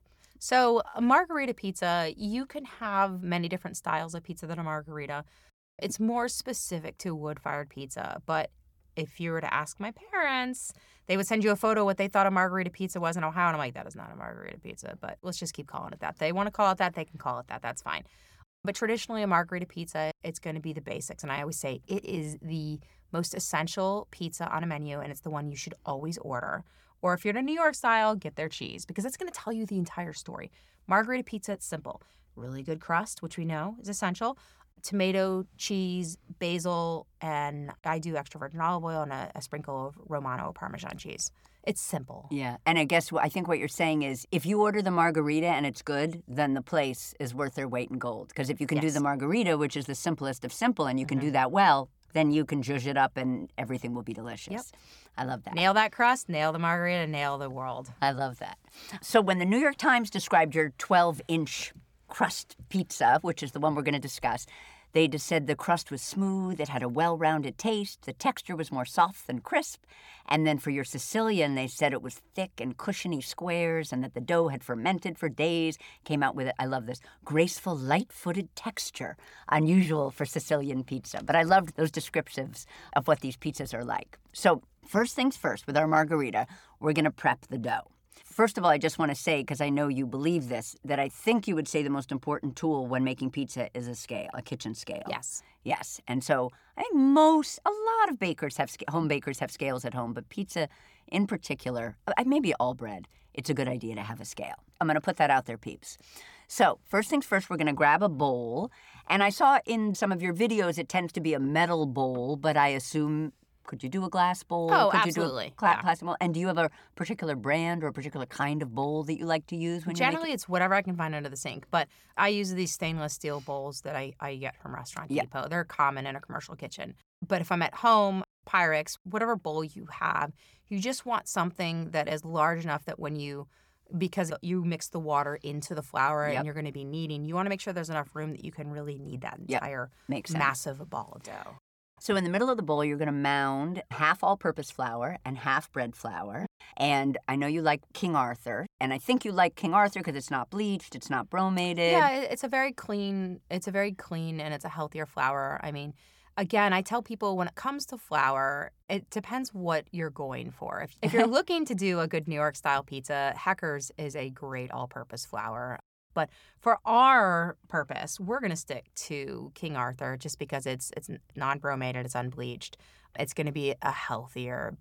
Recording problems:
none

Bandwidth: 18.5 kHz